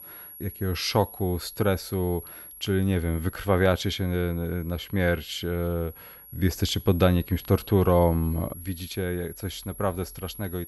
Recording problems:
high-pitched whine; noticeable; throughout; 11.5 kHz, 15 dB below the speech

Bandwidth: 15.5 kHz